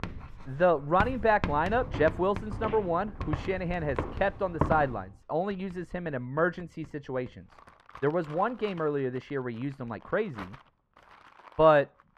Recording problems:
muffled; very; fading above 3.5 kHz
household noises; noticeable; throughout; 15 dB below the speech
footsteps; noticeable; from 2 to 5 s; peak 2 dB below the speech

